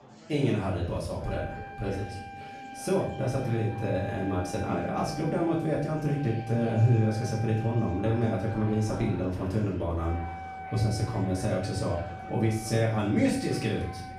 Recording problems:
off-mic speech; far
room echo; noticeable; dies away in 0.5 s
background music; noticeable; throughout; 15 dB below the speech
chatter from many people; noticeable; throughout; 20 dB below the speech

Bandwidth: 15.5 kHz